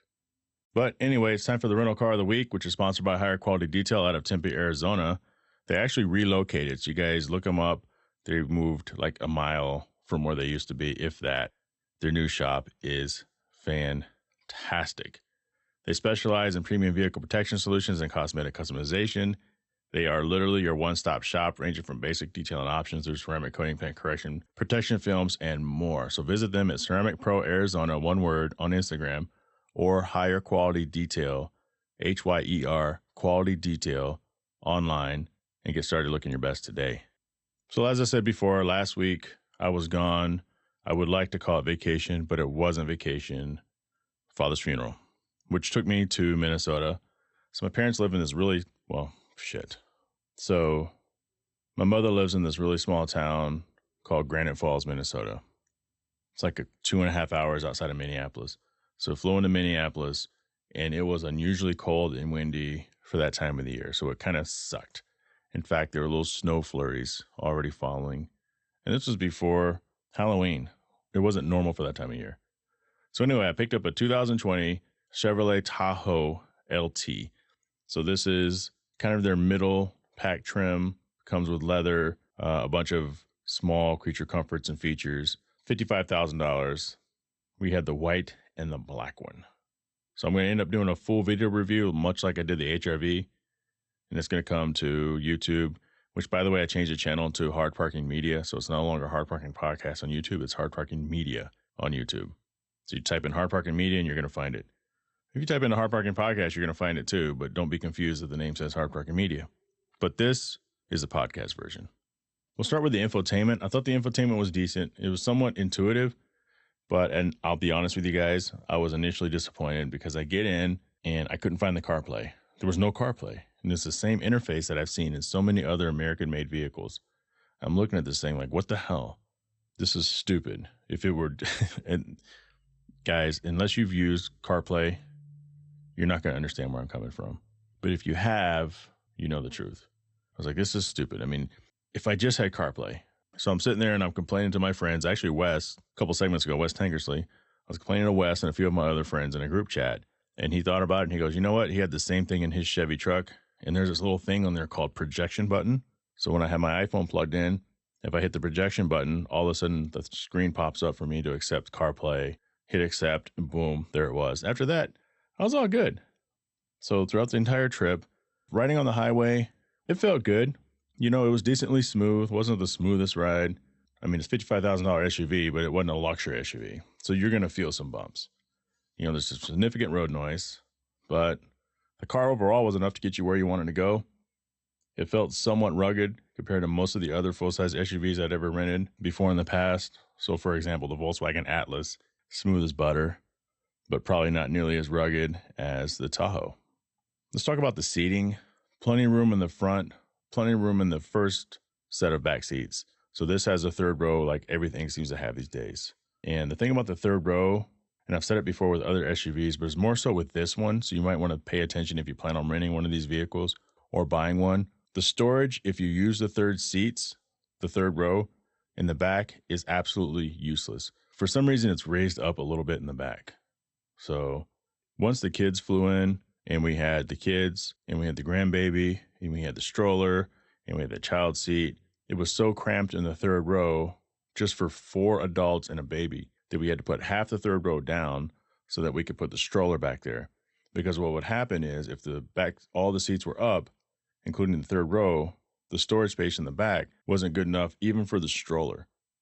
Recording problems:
garbled, watery; slightly; nothing above 8 kHz

